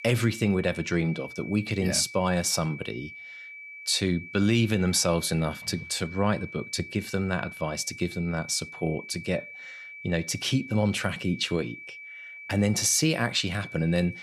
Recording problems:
high-pitched whine; noticeable; throughout; 2.5 kHz, 15 dB below the speech

